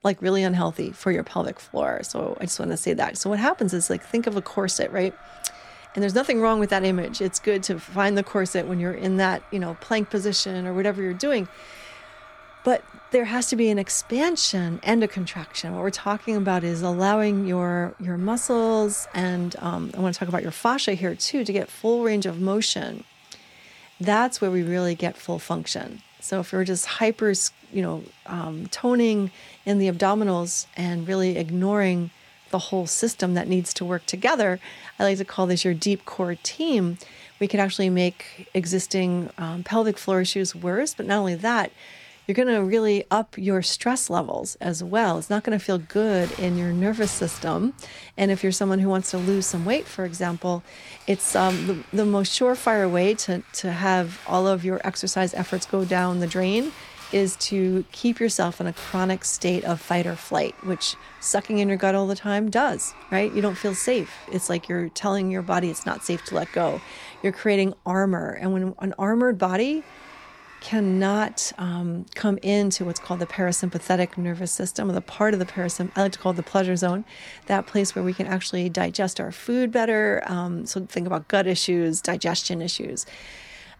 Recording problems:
household noises; faint; throughout; 20 dB below the speech

